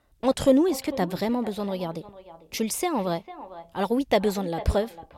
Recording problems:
echo of what is said; noticeable; throughout; 450 ms later, 15 dB below the speech

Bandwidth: 16.5 kHz